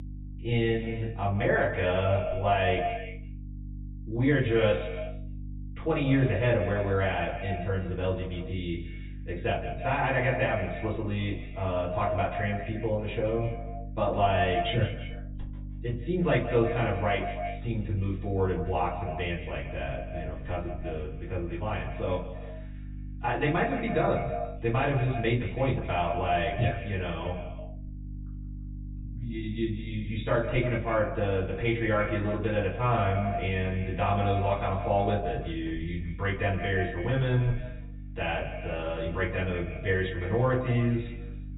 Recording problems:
echo of what is said; strong; throughout; 160 ms later, 9 dB below the speech
off-mic speech; far
high frequencies cut off; severe; nothing above 4 kHz
room echo; slight; dies away in 0.3 s
electrical hum; faint; throughout; 50 Hz, 25 dB below the speech

